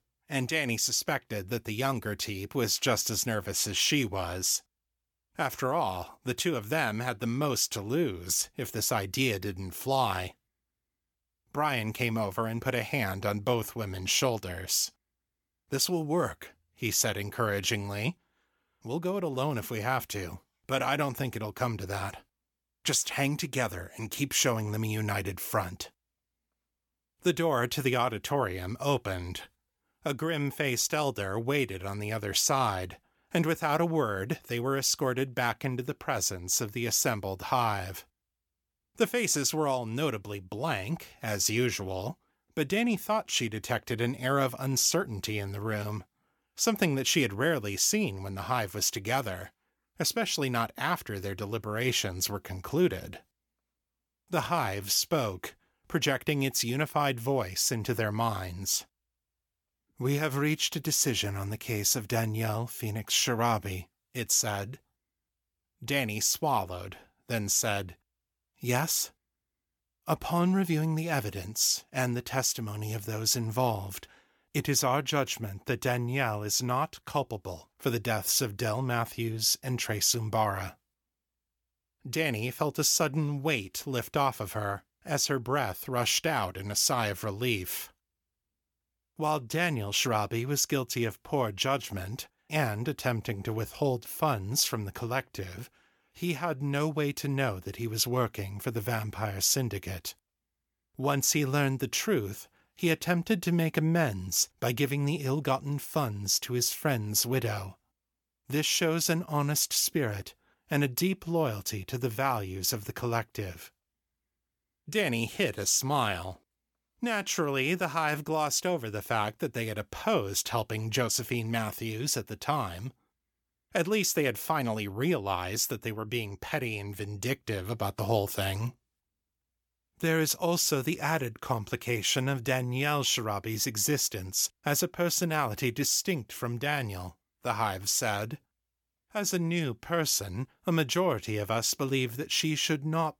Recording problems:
none

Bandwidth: 17.5 kHz